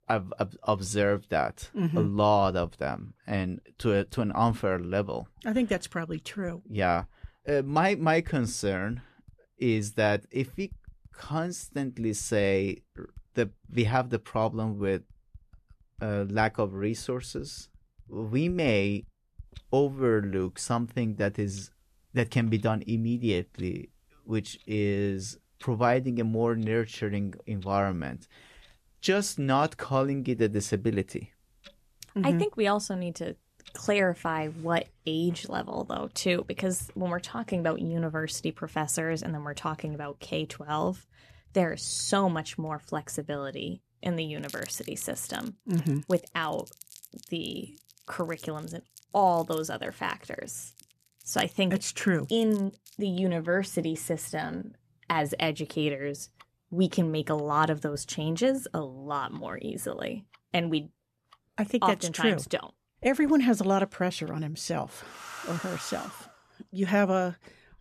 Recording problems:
household noises; faint; throughout; 25 dB below the speech

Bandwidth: 14 kHz